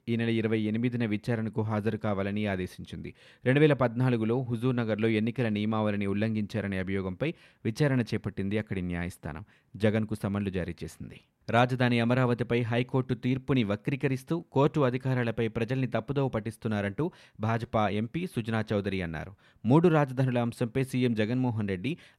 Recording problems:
none

